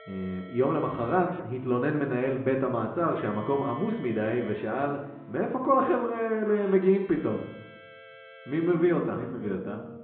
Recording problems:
muffled; very; fading above 1.5 kHz
high frequencies cut off; severe; nothing above 4 kHz
room echo; slight; dies away in 0.6 s
off-mic speech; somewhat distant
background music; noticeable; throughout; 20 dB below the speech

